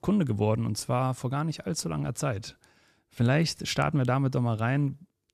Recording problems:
none

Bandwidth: 14 kHz